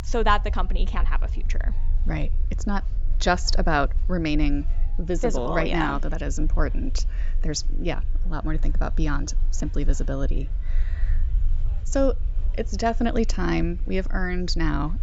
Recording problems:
high frequencies cut off; noticeable; nothing above 8 kHz
murmuring crowd; faint; throughout; 30 dB below the speech
low rumble; faint; throughout; 25 dB below the speech

